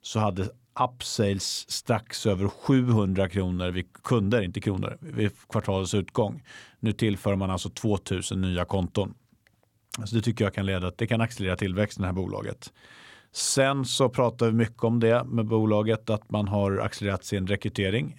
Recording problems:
none

